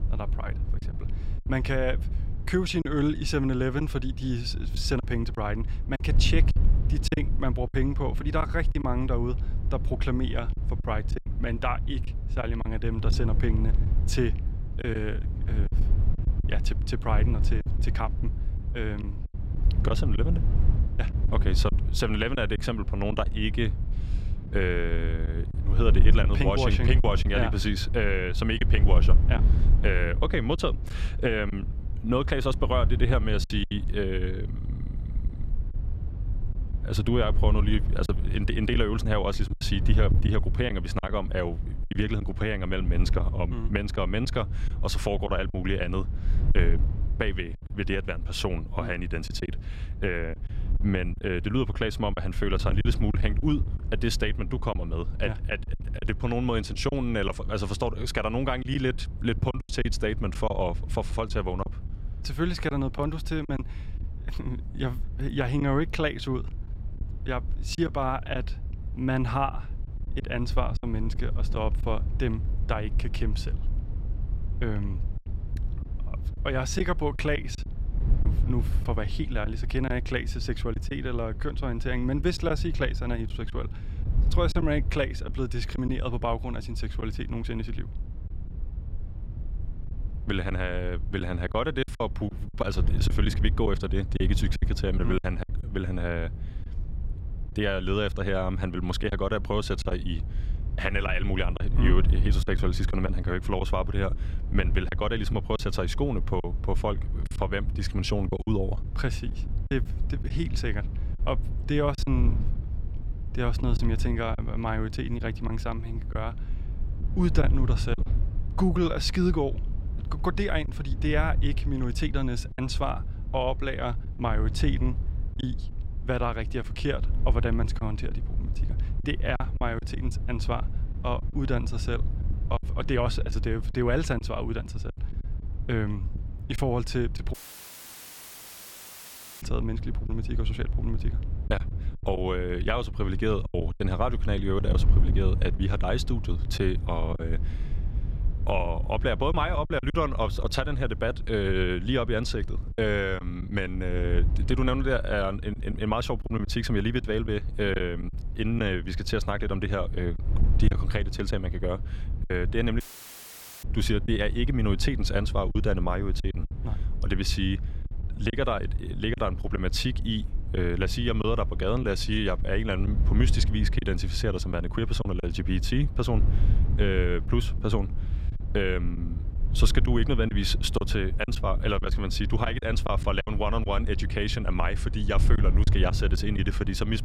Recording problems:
wind noise on the microphone; occasional gusts; 15 dB below the speech
choppy; occasionally; 5% of the speech affected
audio cutting out; at 2:17 for 2 s and at 2:43 for 1 s

